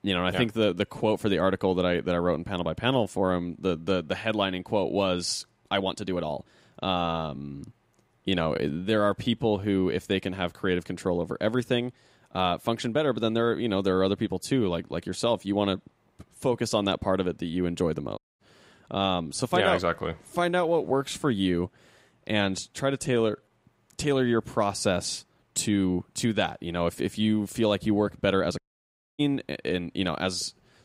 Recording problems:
uneven, jittery; strongly; from 0.5 to 29 s
audio cutting out; at 18 s and at 29 s for 0.5 s

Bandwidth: 15.5 kHz